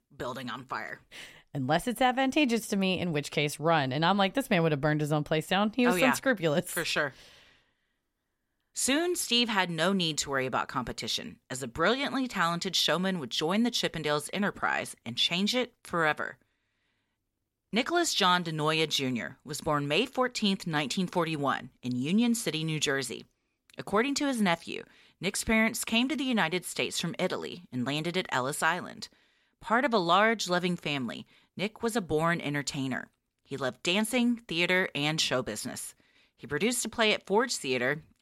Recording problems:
none

